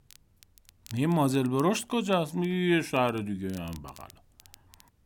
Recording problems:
crackle, like an old record; faint; 25 dB below the speech

